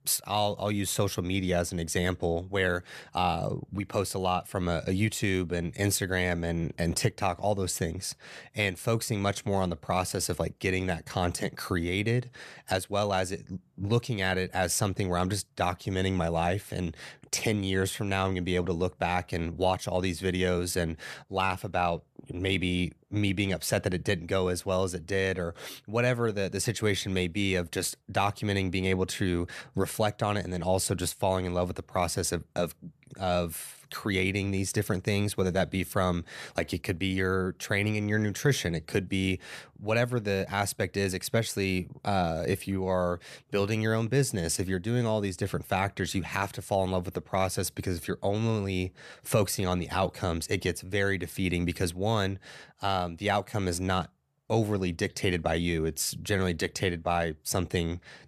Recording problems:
none

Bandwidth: 14 kHz